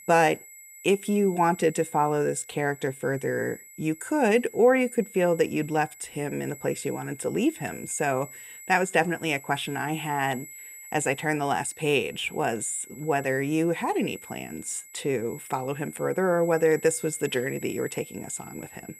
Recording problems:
high-pitched whine; noticeable; throughout; 8 kHz, 15 dB below the speech

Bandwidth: 15.5 kHz